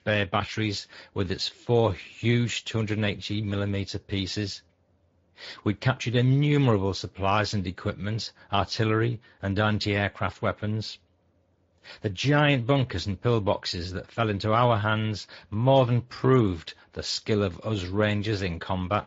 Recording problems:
high frequencies cut off; noticeable; nothing above 7.5 kHz
garbled, watery; slightly

